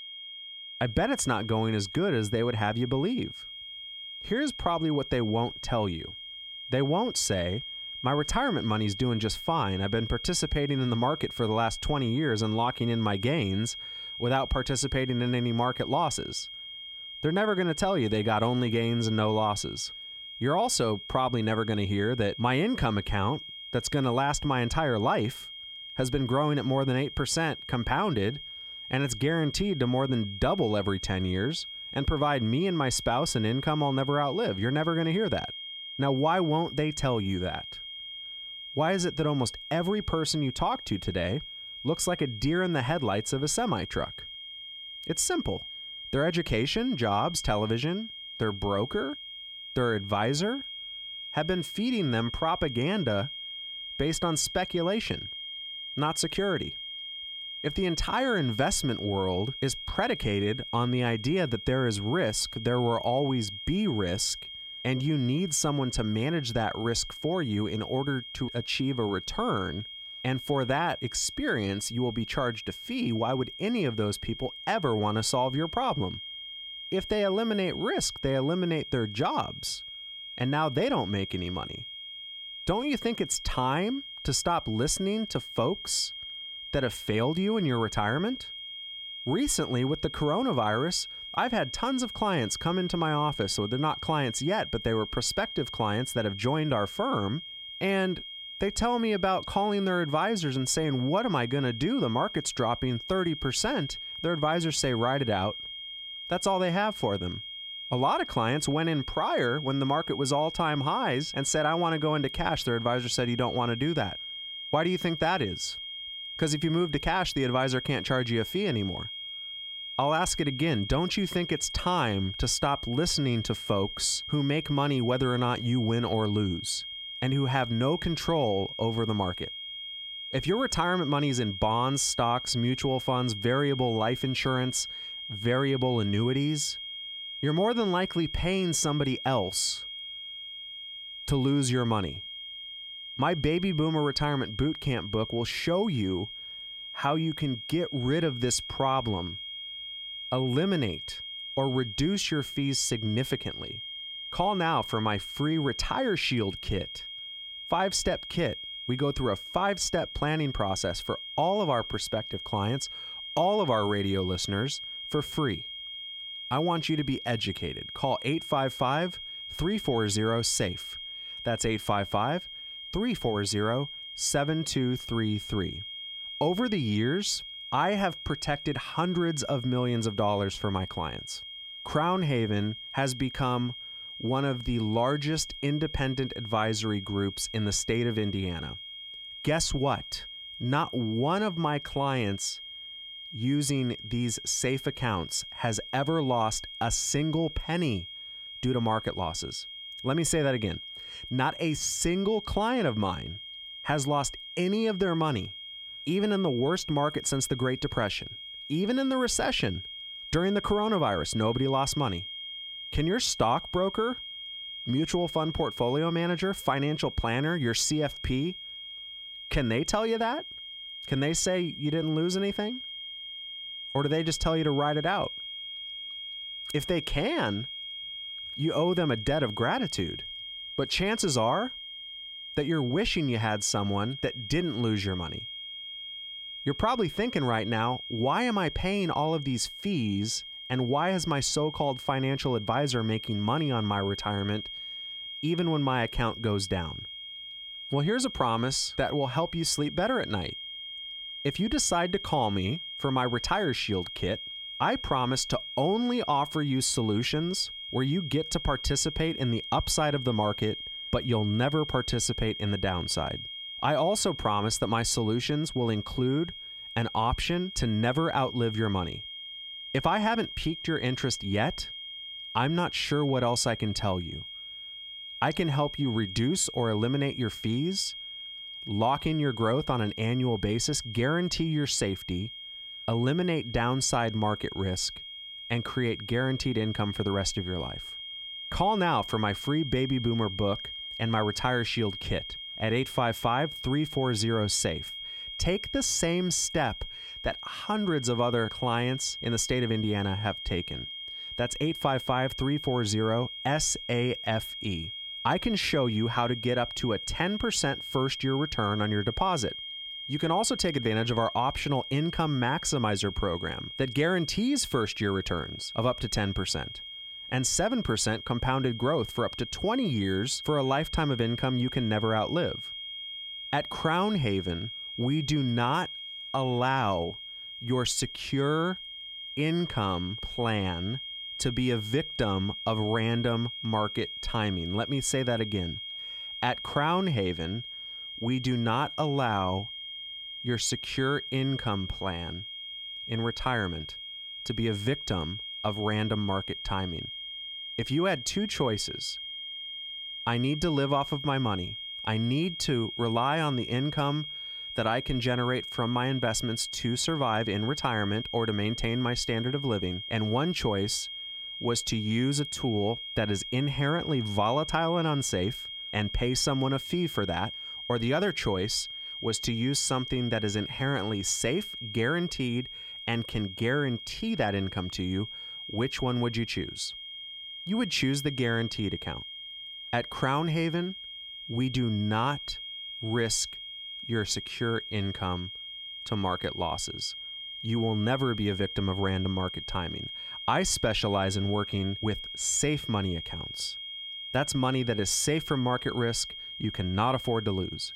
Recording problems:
high-pitched whine; loud; throughout; 3 kHz, 9 dB below the speech

